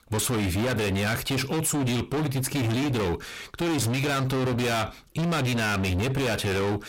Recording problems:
distortion; heavy; 45% of the sound clipped

